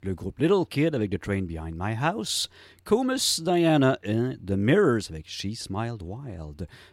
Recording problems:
none

